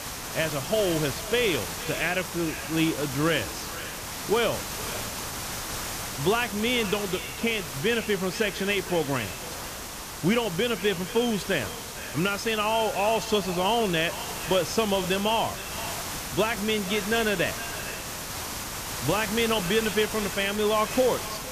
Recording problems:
echo of what is said; noticeable; throughout; 460 ms later, 15 dB below the speech
hiss; loud; throughout; 7 dB below the speech

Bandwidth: 14.5 kHz